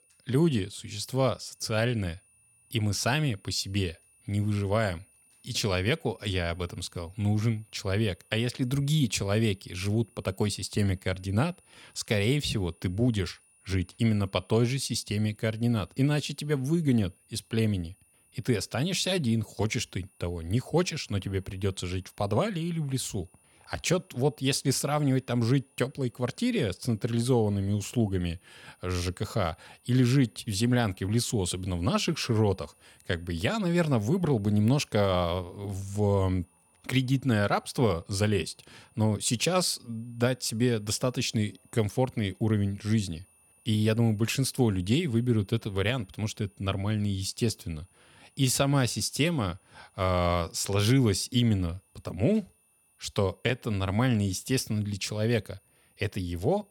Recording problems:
high-pitched whine; faint; throughout; 9.5 kHz, 35 dB below the speech

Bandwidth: 18 kHz